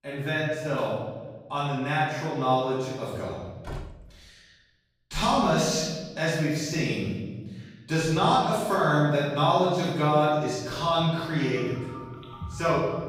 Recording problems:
room echo; strong; dies away in 1.3 s
off-mic speech; far
door banging; faint; at 3.5 s; peak 15 dB below the speech
phone ringing; faint; from 11 s on; peak 15 dB below the speech

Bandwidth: 15.5 kHz